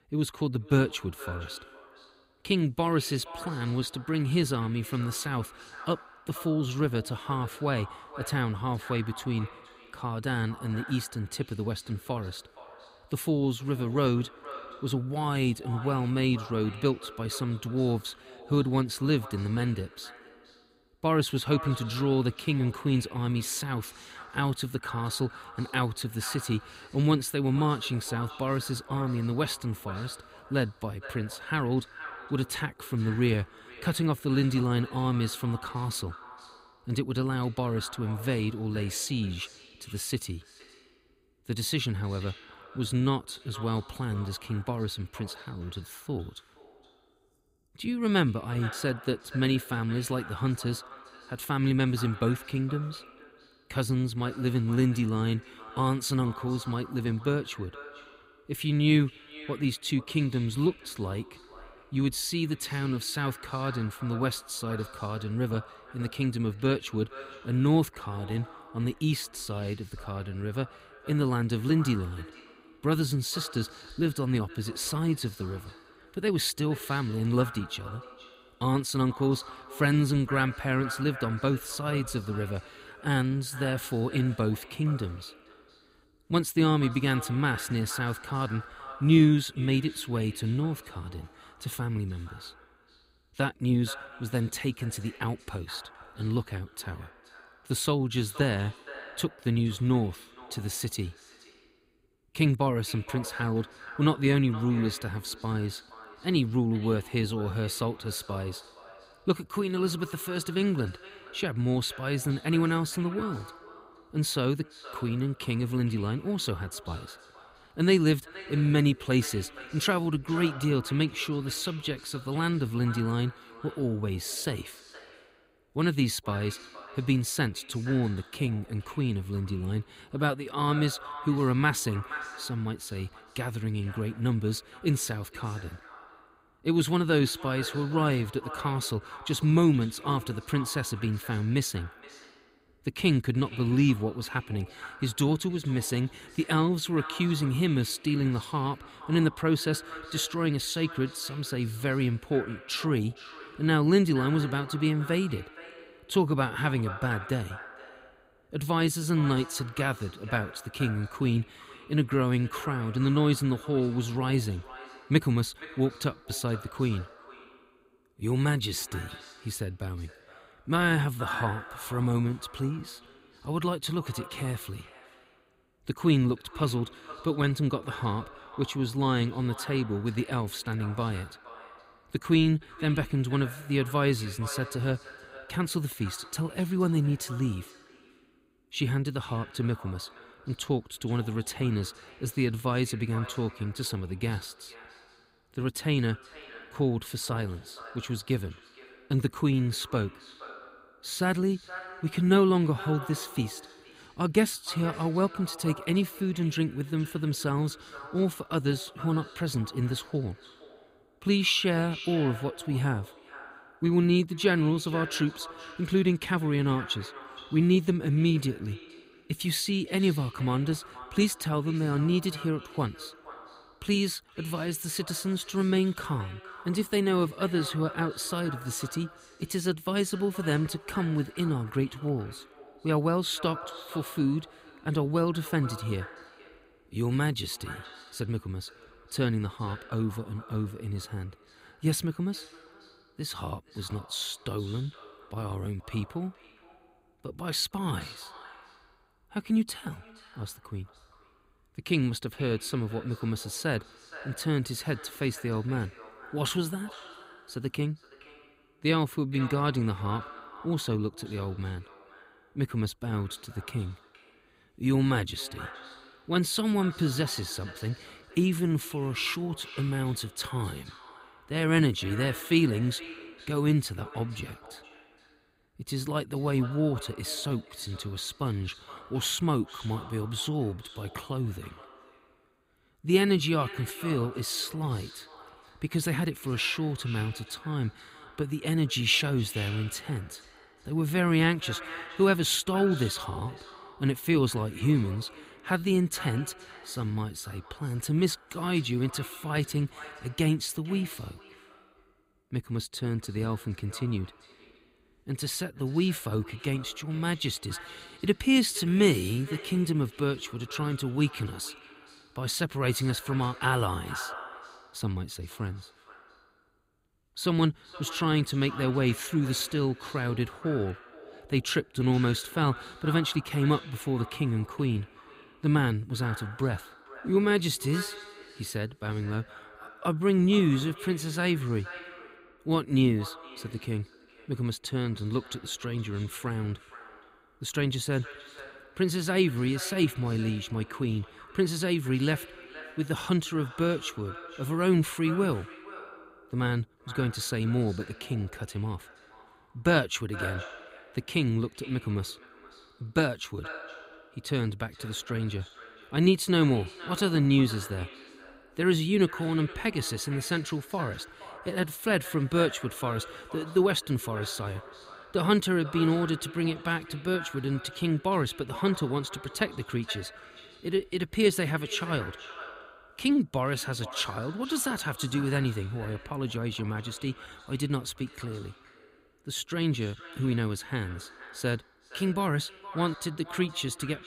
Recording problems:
echo of what is said; noticeable; throughout; 470 ms later, 15 dB below the speech

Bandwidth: 15.5 kHz